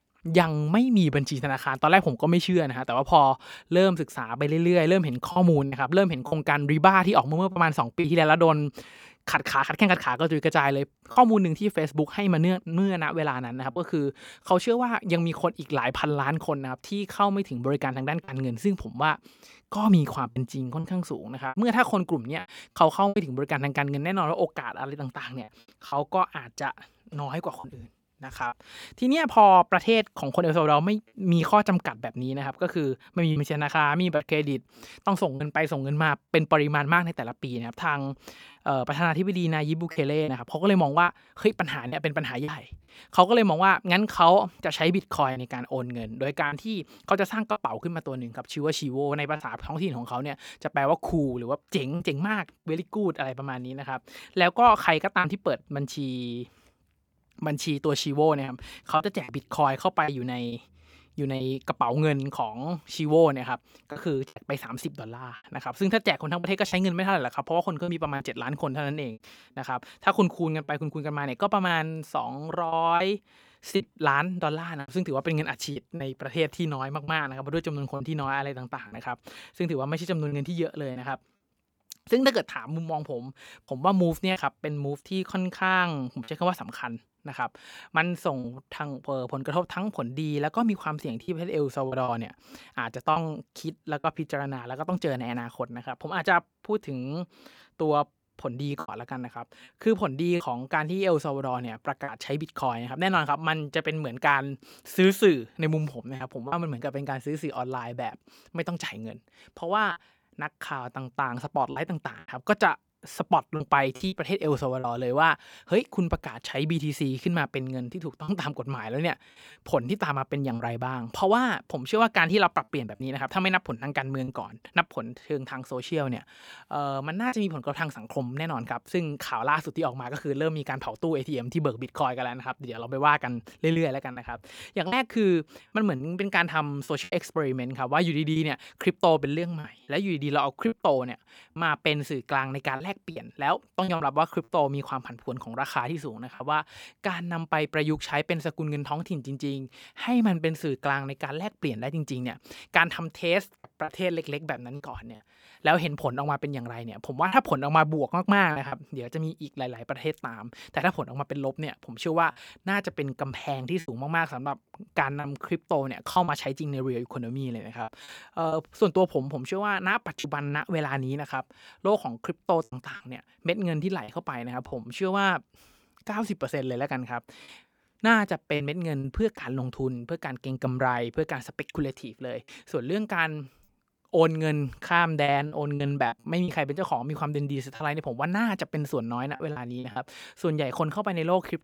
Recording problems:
choppy; occasionally; 3% of the speech affected

